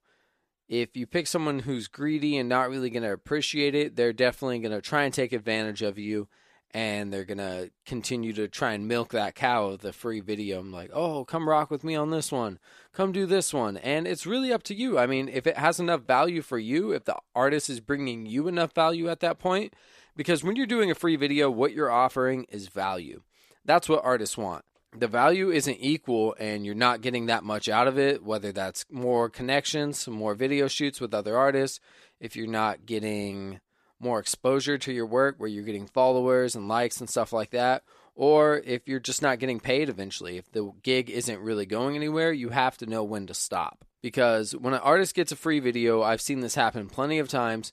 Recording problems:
none

